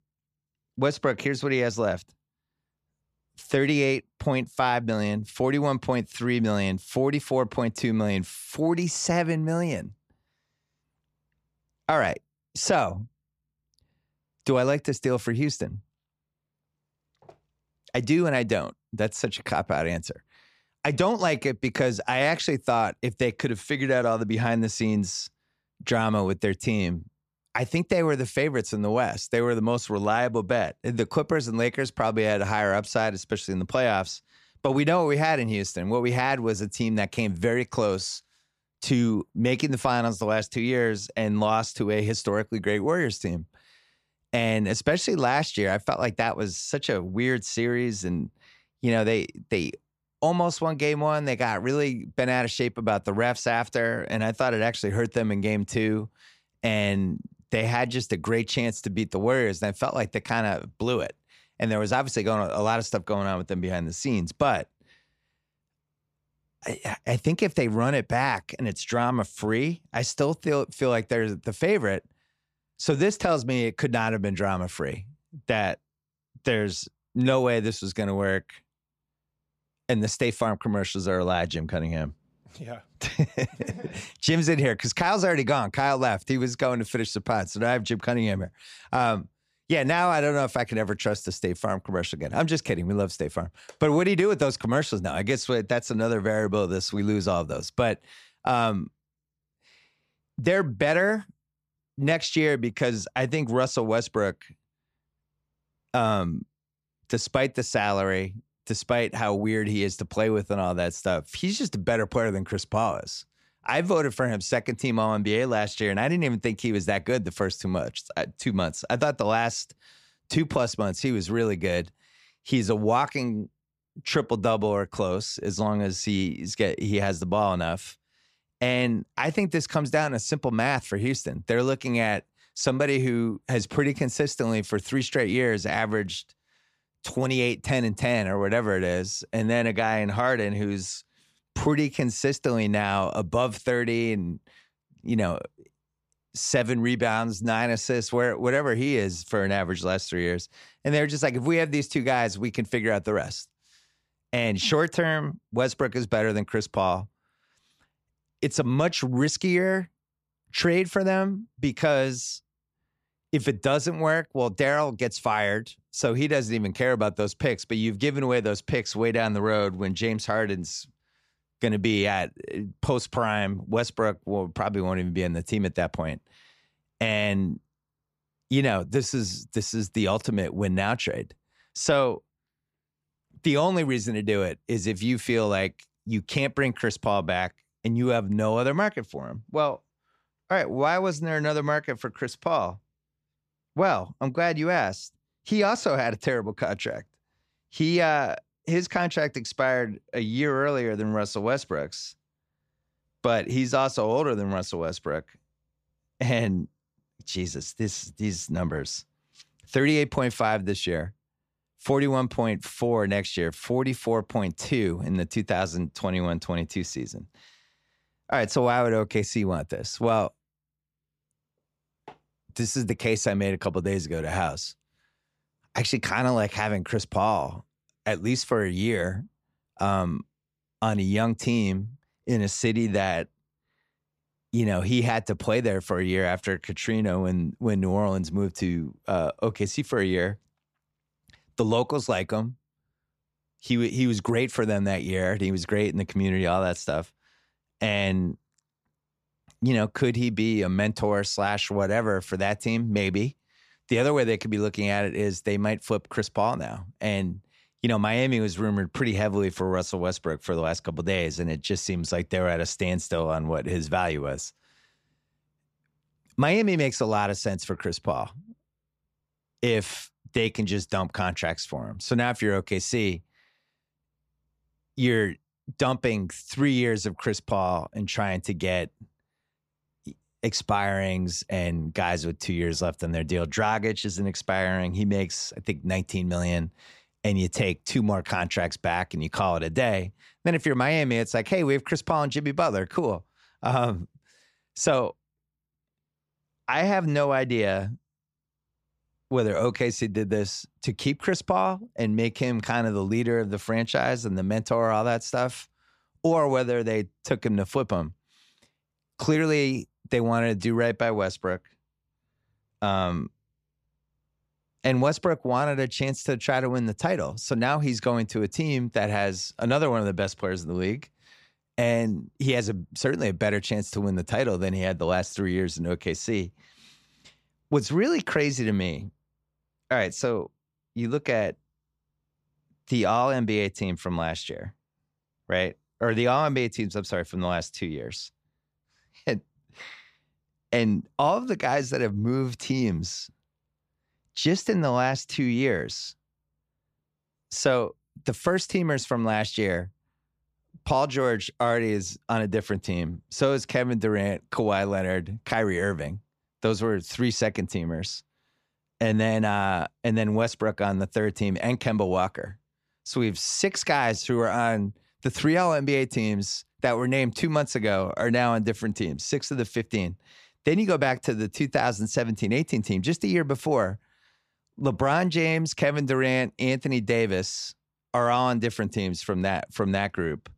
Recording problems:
none

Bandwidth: 14.5 kHz